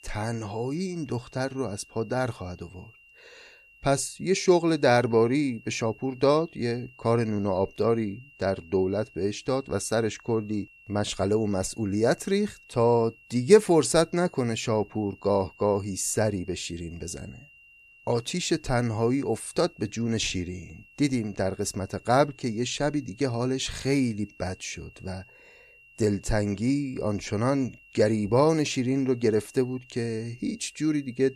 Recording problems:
high-pitched whine; faint; throughout; 2.5 kHz, 25 dB below the speech

